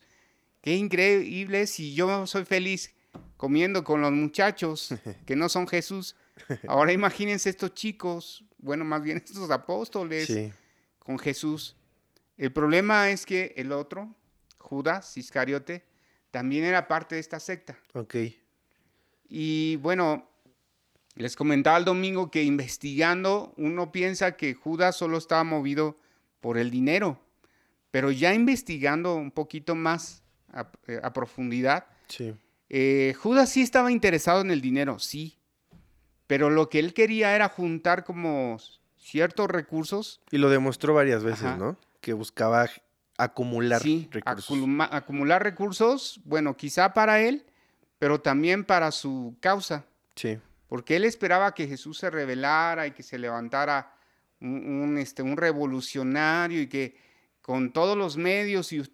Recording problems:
none

